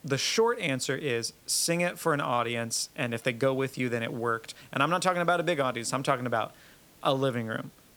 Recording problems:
hiss; faint; throughout; 25 dB below the speech

